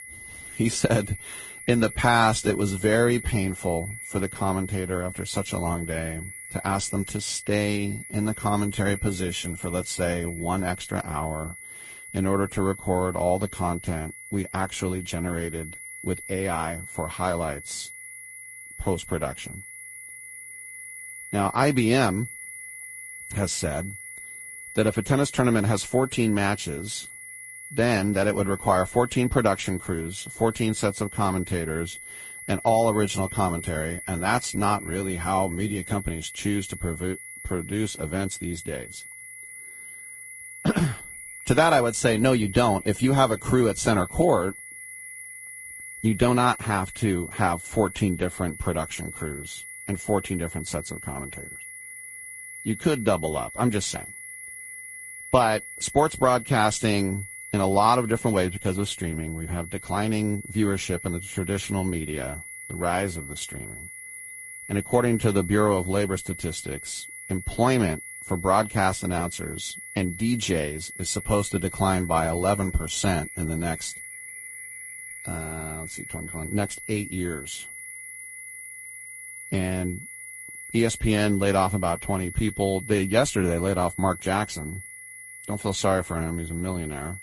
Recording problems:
garbled, watery; slightly
high-pitched whine; noticeable; throughout; 2 kHz, 10 dB below the speech

